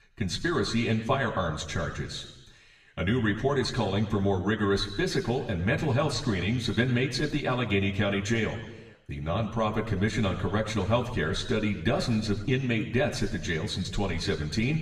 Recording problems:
room echo; slight; dies away in 1 s
off-mic speech; somewhat distant

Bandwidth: 15 kHz